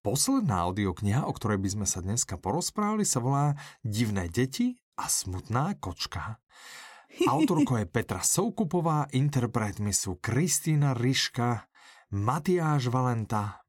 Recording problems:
none

